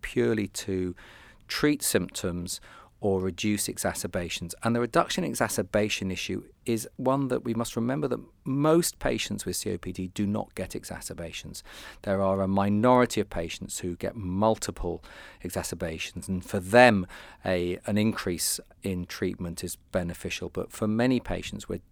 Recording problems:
none

